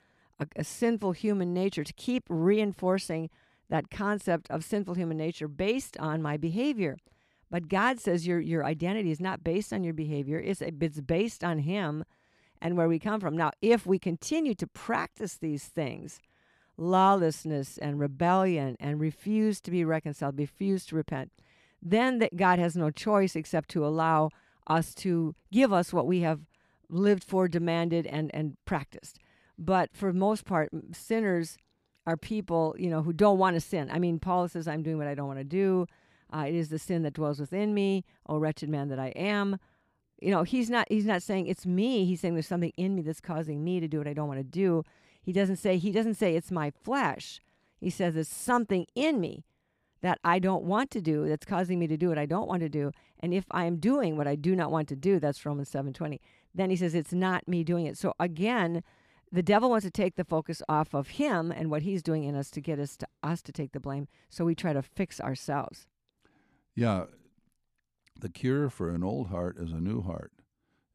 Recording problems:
none

